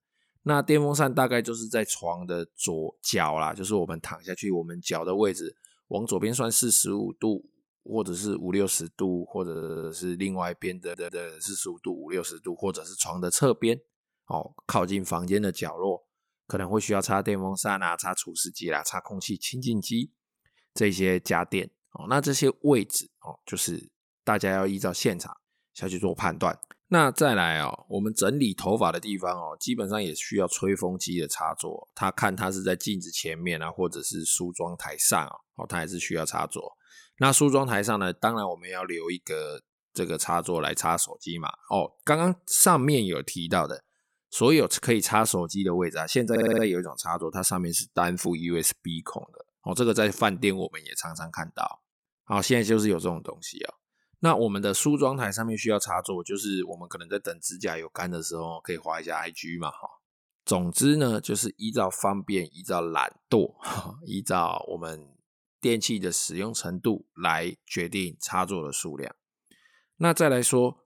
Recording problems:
audio stuttering; at 9.5 s, at 11 s and at 46 s

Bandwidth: 17.5 kHz